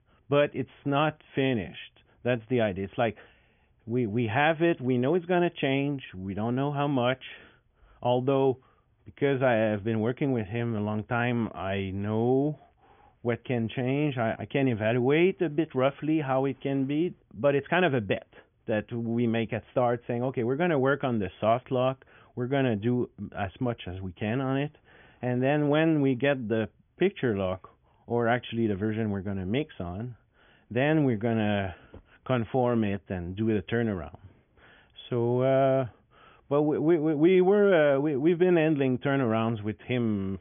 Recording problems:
high frequencies cut off; severe; nothing above 3.5 kHz

